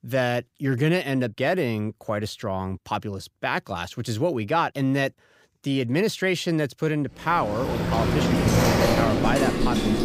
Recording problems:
rain or running water; very loud; from 7.5 s on; 3 dB above the speech

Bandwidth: 15.5 kHz